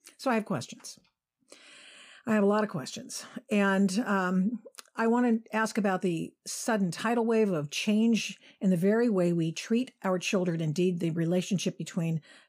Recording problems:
none

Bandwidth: 15 kHz